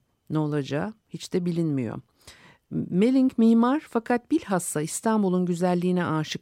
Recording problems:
none

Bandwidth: 16 kHz